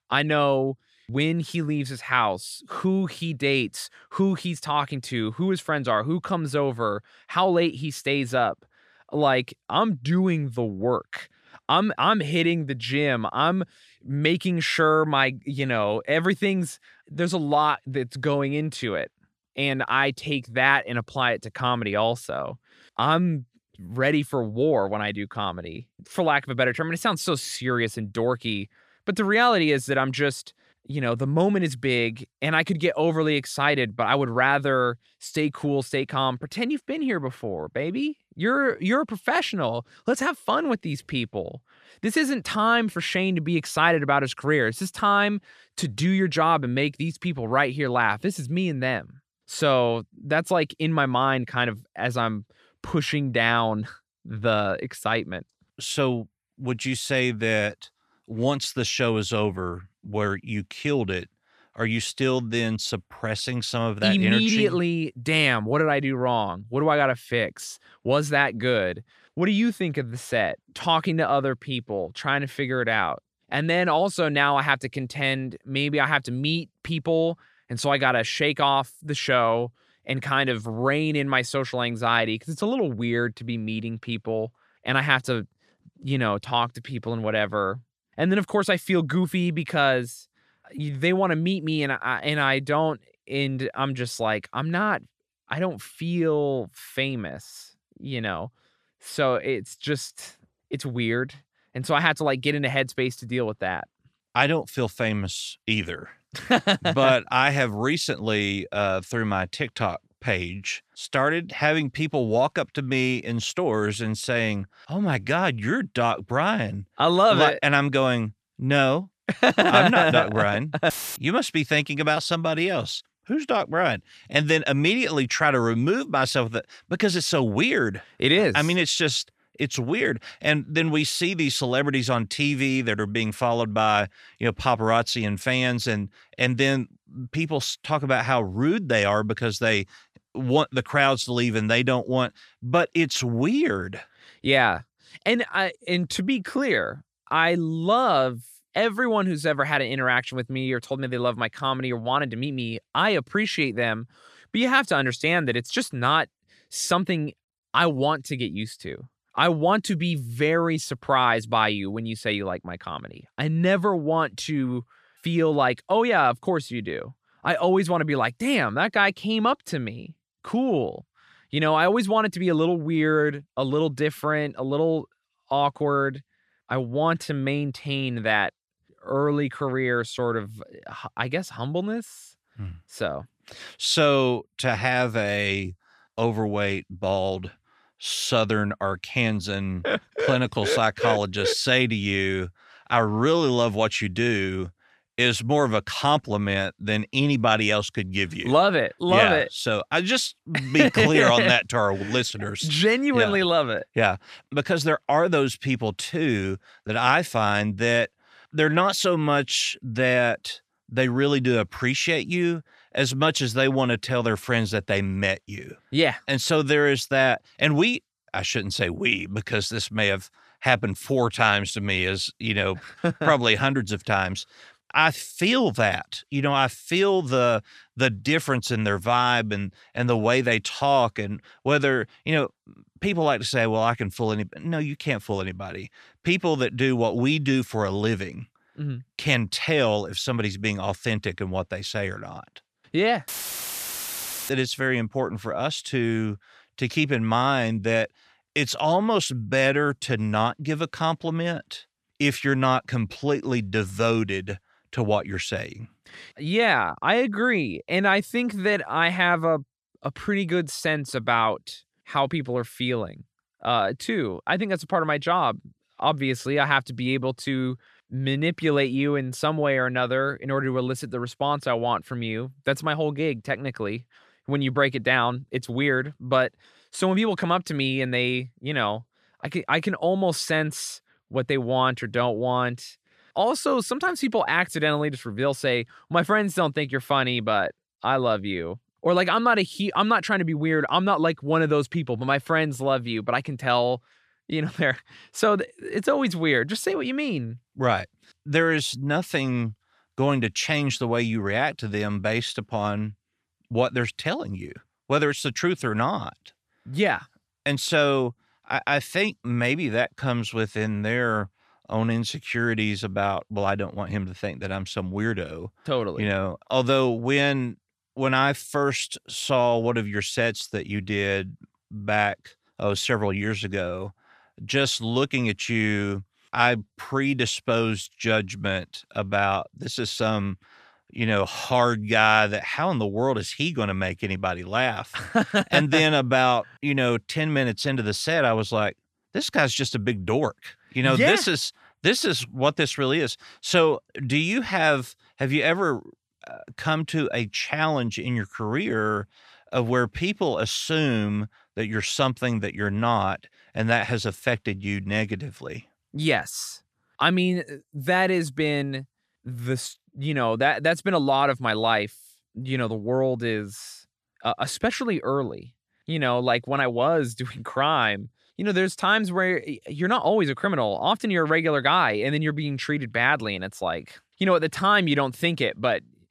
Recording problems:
audio cutting out; filled with static; at 2:01 and at 4:03 for 1 s

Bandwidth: 14.5 kHz